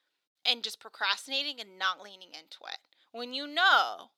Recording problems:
thin; very; fading below 600 Hz

